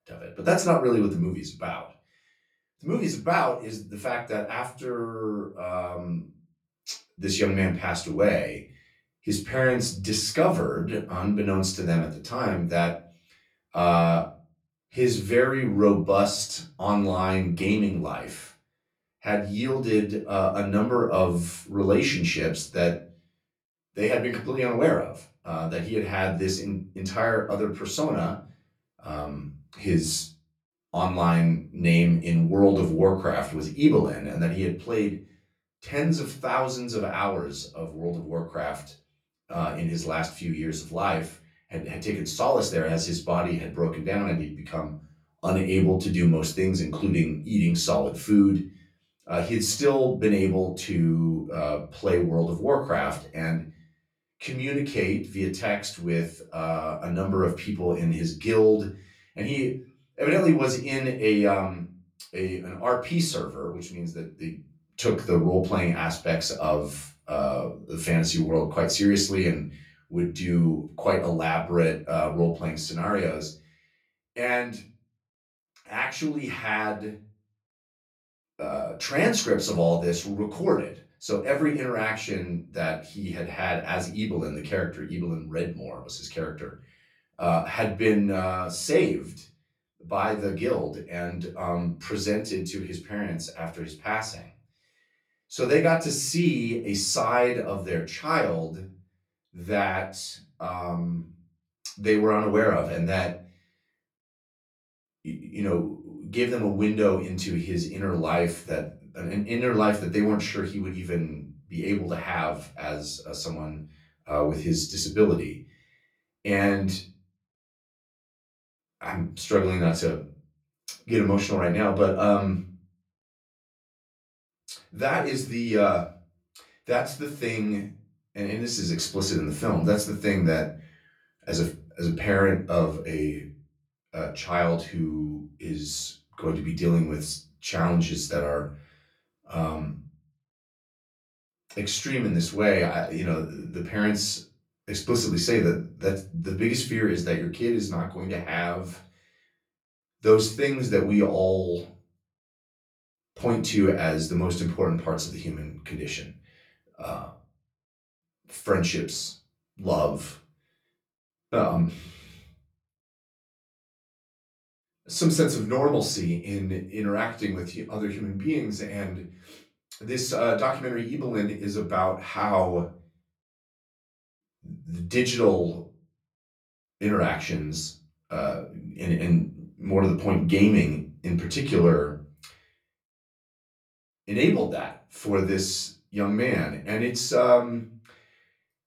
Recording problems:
off-mic speech; far
room echo; slight; dies away in 0.3 s

